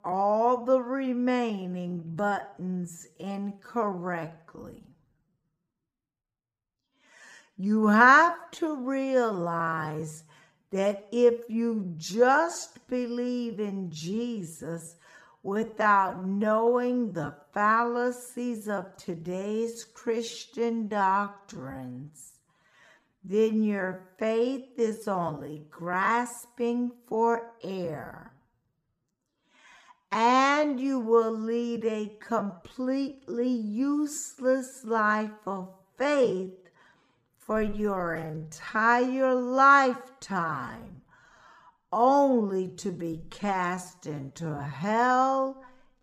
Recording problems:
wrong speed, natural pitch; too slow; 0.5 times normal speed

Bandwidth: 15 kHz